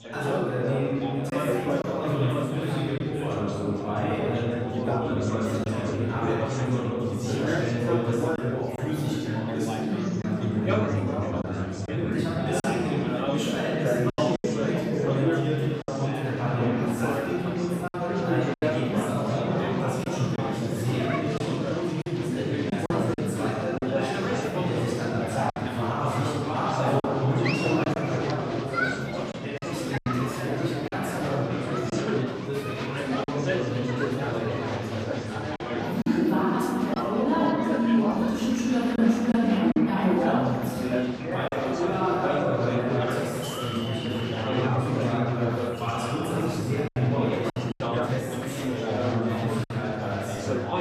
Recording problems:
room echo; strong; dies away in 3 s
off-mic speech; far
chatter from many people; loud; throughout; 3 dB below the speech
choppy; occasionally; 3% of the speech affected

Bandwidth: 15 kHz